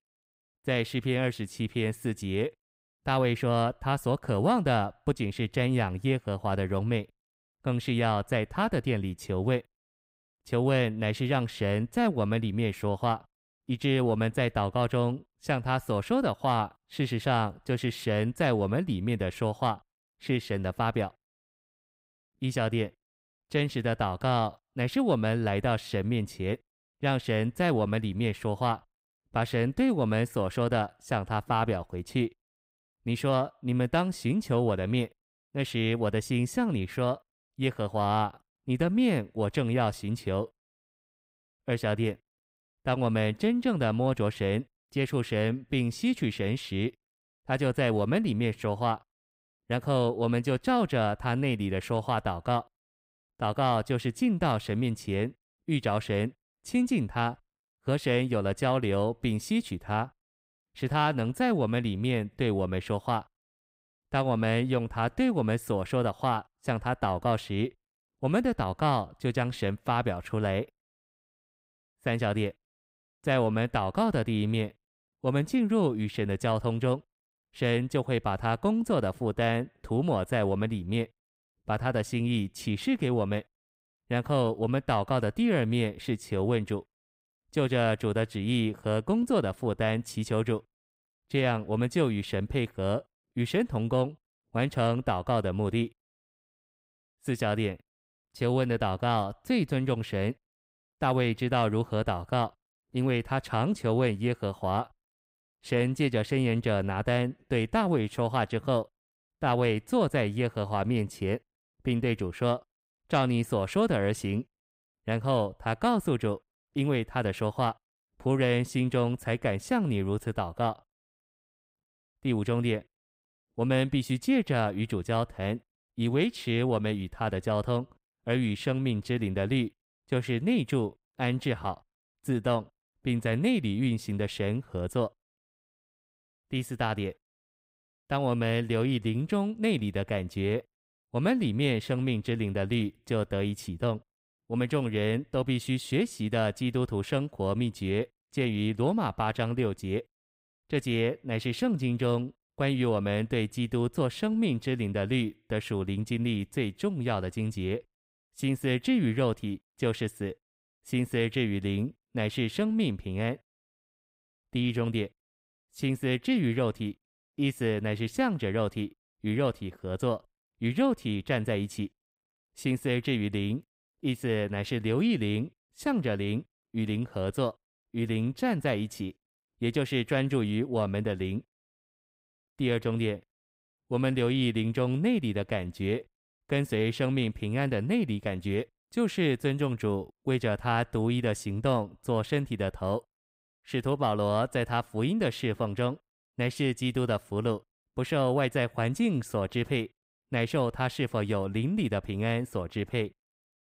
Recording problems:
none

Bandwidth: 15.5 kHz